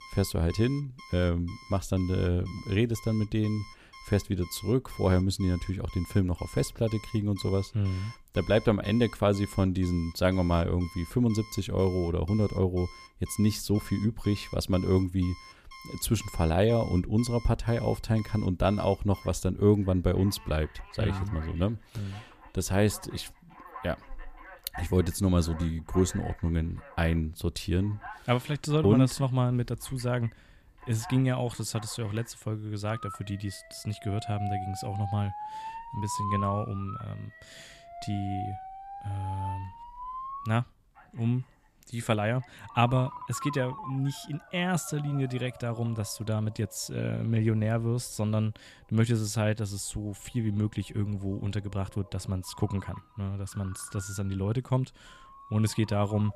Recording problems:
alarms or sirens; noticeable; throughout; 15 dB below the speech

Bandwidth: 15 kHz